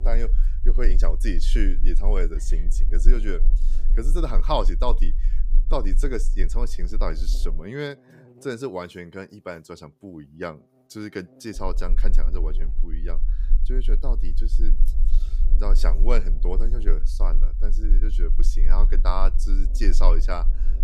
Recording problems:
low rumble; noticeable; until 7.5 s and from 12 s on; 20 dB below the speech
electrical hum; faint; throughout; 50 Hz, 25 dB below the speech

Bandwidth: 15.5 kHz